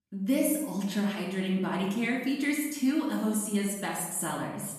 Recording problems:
off-mic speech; far
room echo; noticeable; dies away in 0.9 s

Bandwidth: 14 kHz